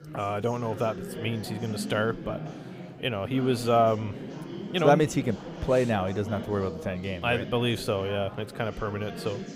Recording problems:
chatter from many people; noticeable; throughout; 10 dB below the speech

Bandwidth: 15.5 kHz